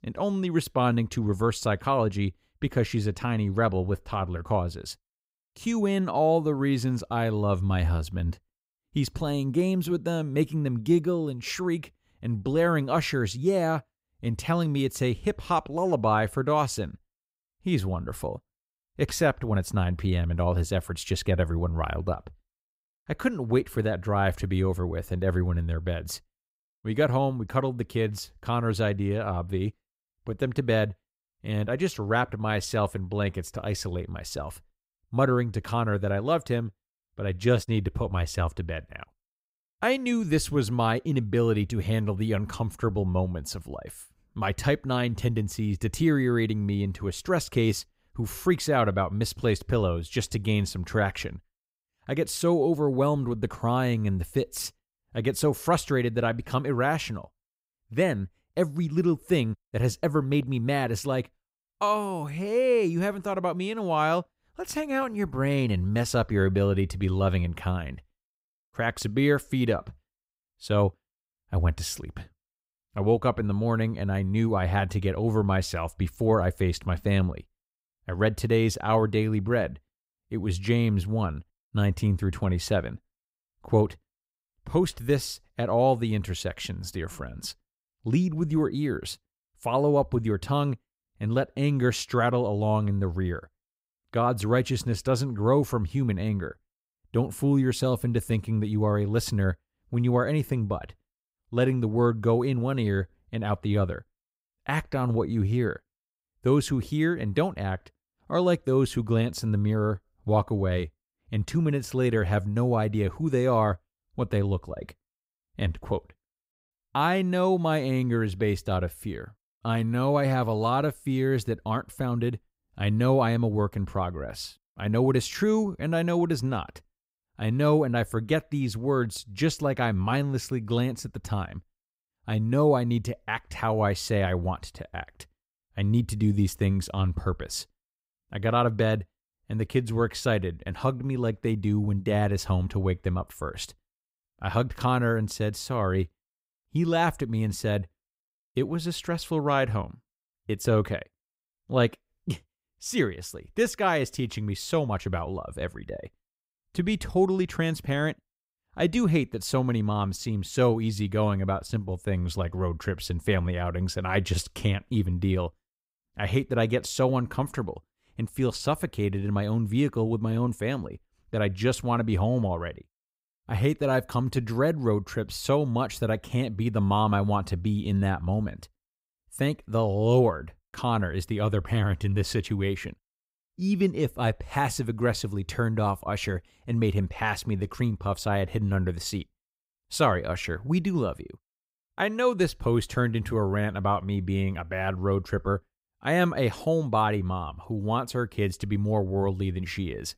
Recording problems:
none

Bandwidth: 15.5 kHz